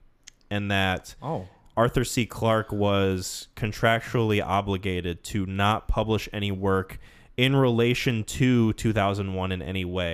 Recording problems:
abrupt cut into speech; at the end

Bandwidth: 14.5 kHz